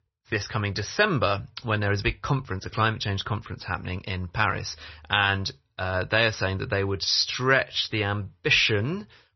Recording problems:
garbled, watery; slightly; nothing above 6 kHz

